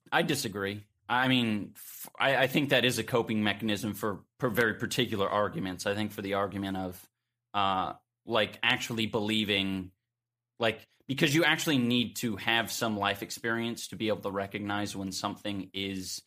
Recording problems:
none

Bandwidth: 15 kHz